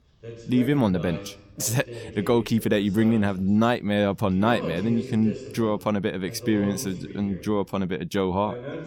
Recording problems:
voice in the background; noticeable; throughout; 15 dB below the speech

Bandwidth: 17.5 kHz